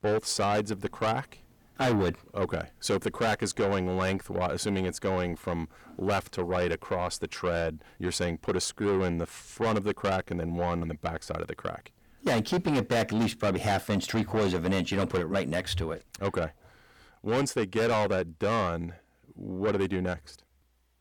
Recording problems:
distortion; heavy; 6 dB below the speech

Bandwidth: 18.5 kHz